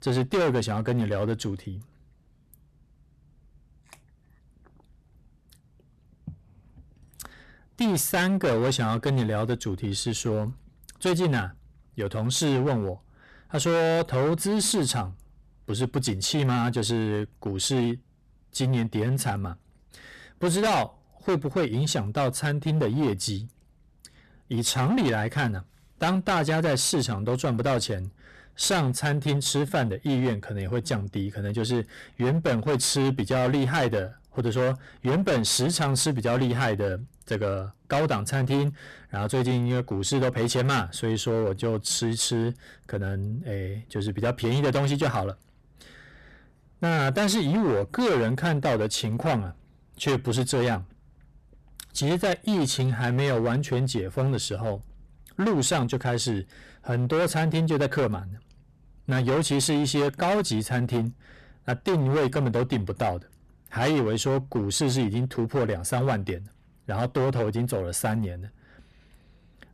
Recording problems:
distortion; heavy; 15% of the sound clipped

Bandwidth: 13.5 kHz